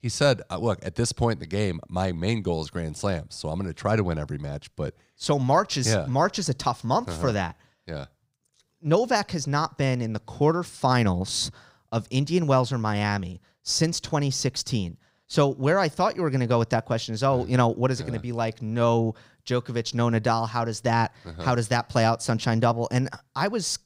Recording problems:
none

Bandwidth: 15.5 kHz